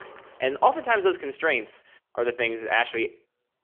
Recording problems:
phone-call audio; poor line; nothing above 3.5 kHz
traffic noise; faint; throughout; 25 dB below the speech

